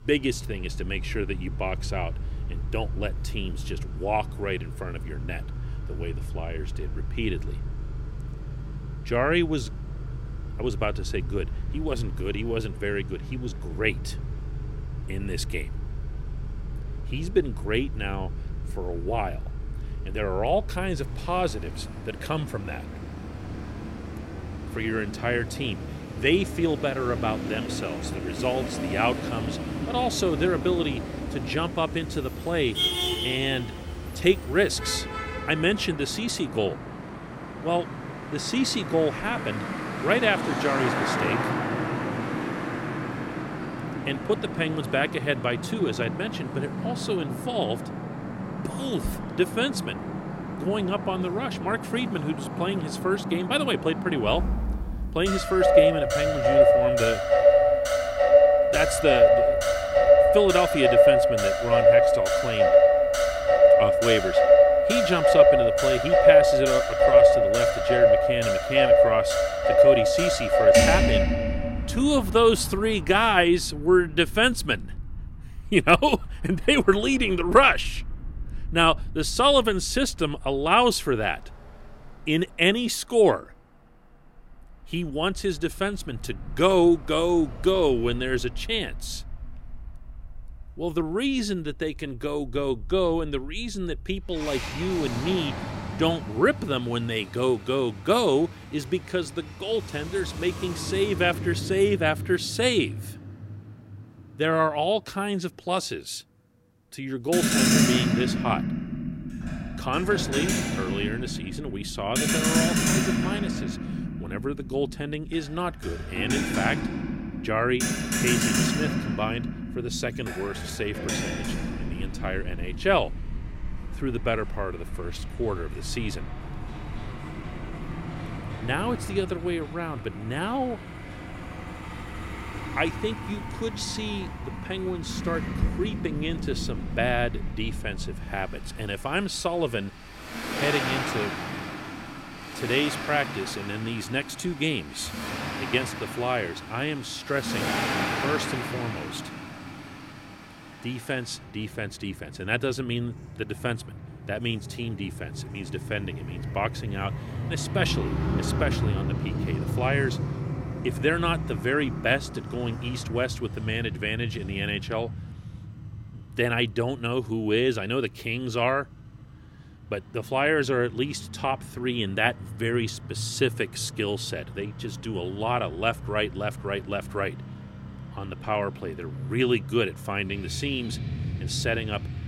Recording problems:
traffic noise; very loud; throughout; 1 dB above the speech

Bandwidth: 16 kHz